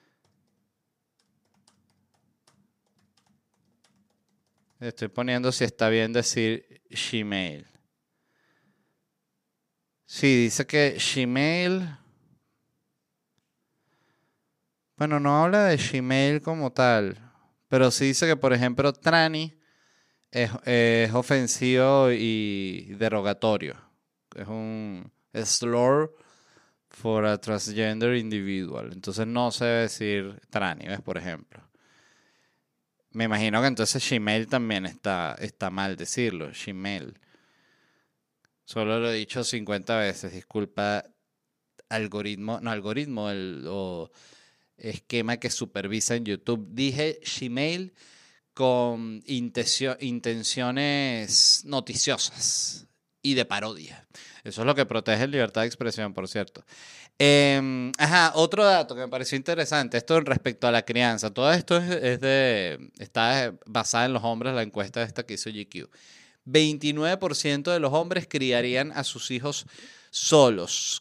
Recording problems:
none

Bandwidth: 15 kHz